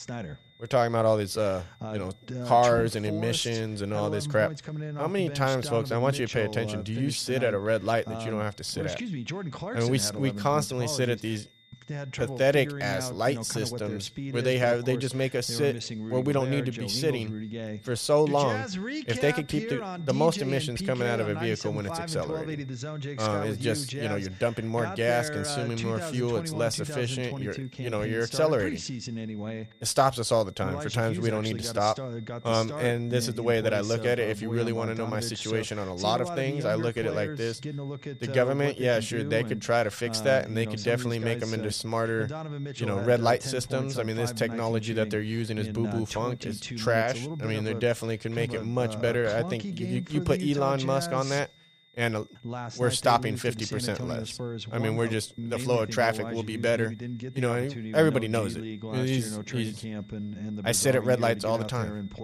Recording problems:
voice in the background; loud; throughout; 8 dB below the speech
high-pitched whine; faint; throughout; 3.5 kHz, 30 dB below the speech

